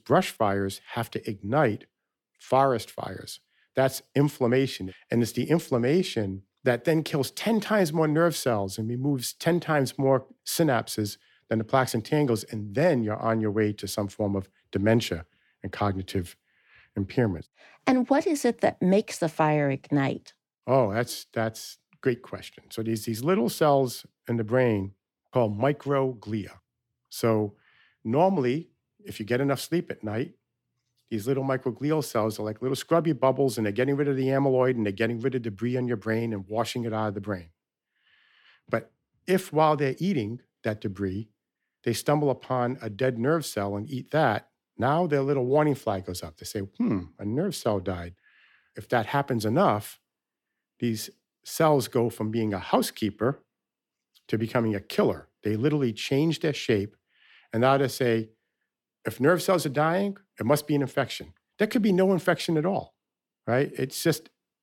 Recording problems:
none

